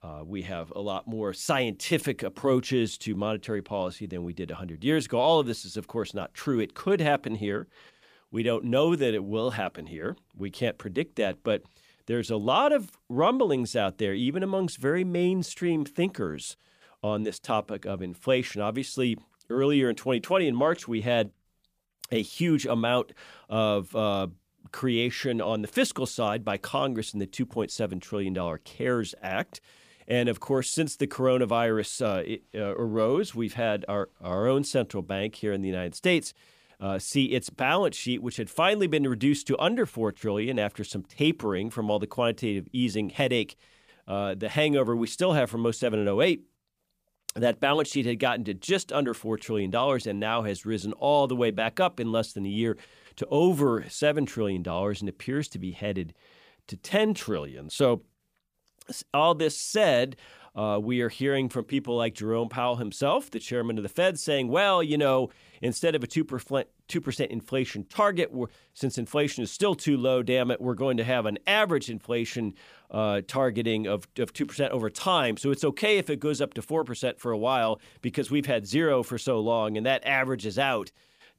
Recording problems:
none

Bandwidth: 15 kHz